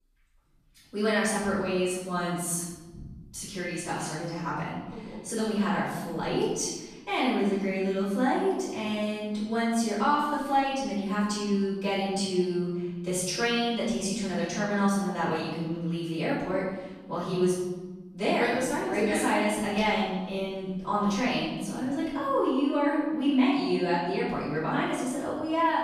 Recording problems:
room echo; strong; dies away in 1.2 s
off-mic speech; far

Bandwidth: 14.5 kHz